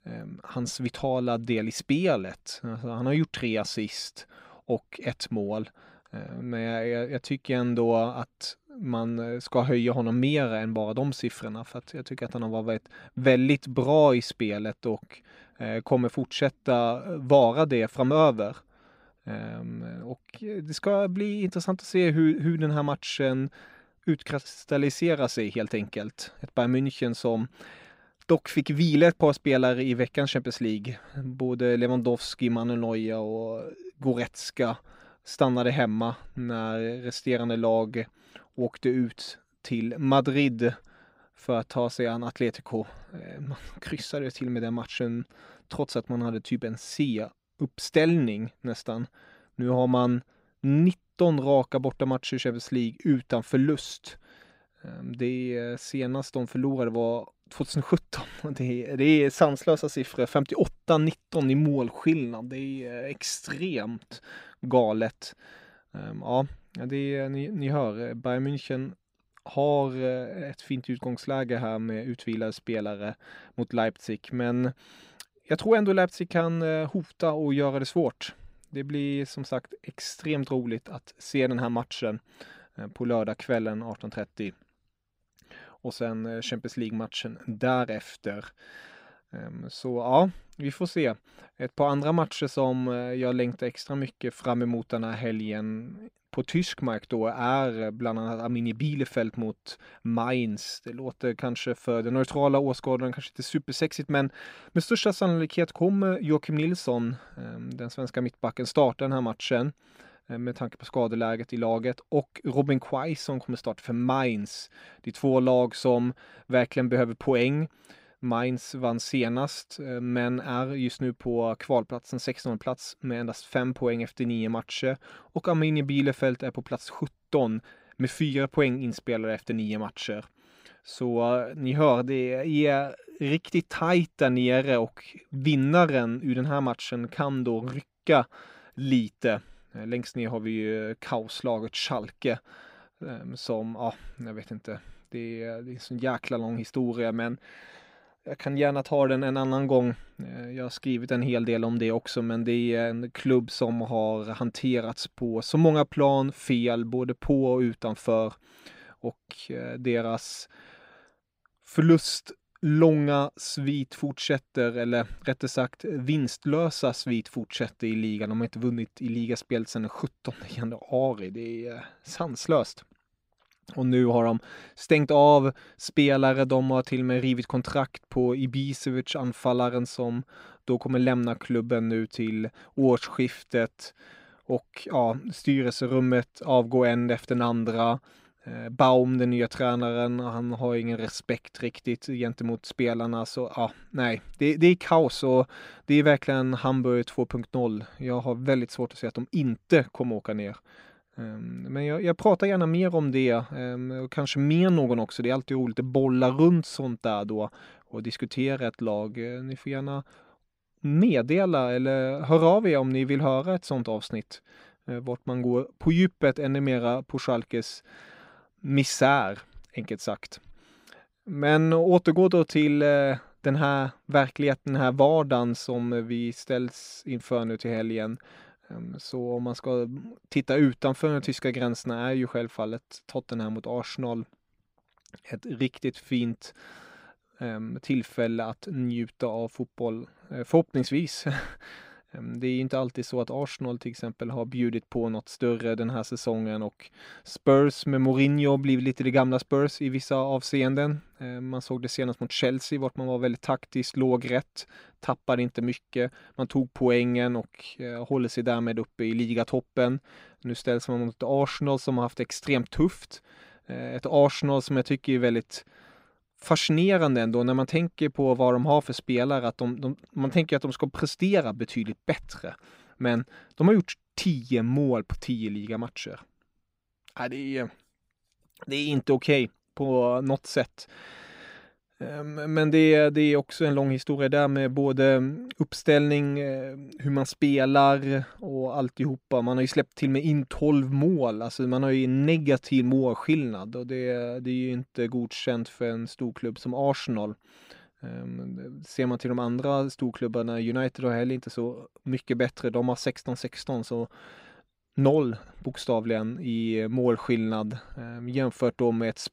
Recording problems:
none

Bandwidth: 15.5 kHz